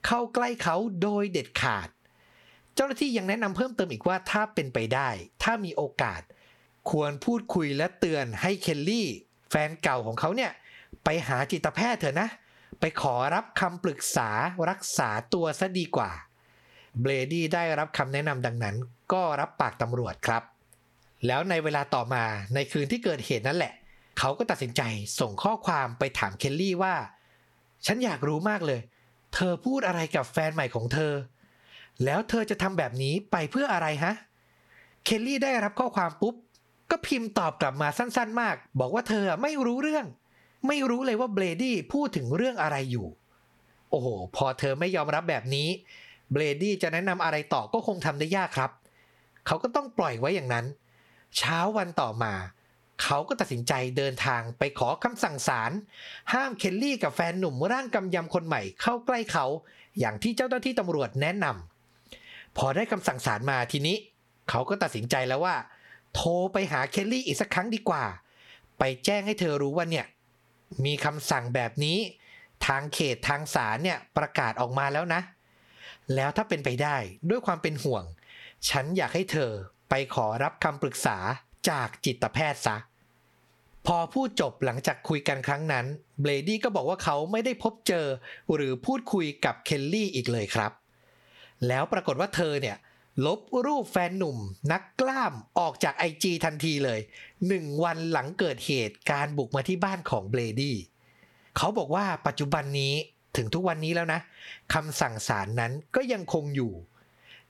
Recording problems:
squashed, flat; somewhat

